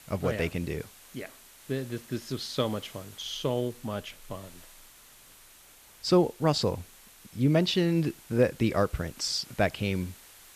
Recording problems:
hiss; faint; throughout; 20 dB below the speech

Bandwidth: 14.5 kHz